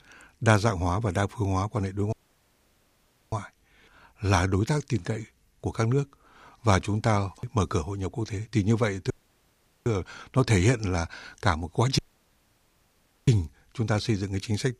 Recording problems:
audio cutting out; at 2 s for 1 s, at 9 s for 1 s and at 12 s for 1.5 s

